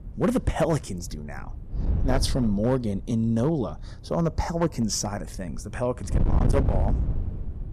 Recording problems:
distortion; slight; 7% of the sound clipped
wind noise on the microphone; heavy; 9 dB below the speech

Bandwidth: 14.5 kHz